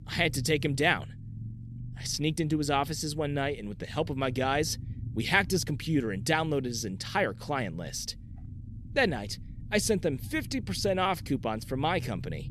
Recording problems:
low rumble; faint; throughout; 25 dB below the speech

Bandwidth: 14.5 kHz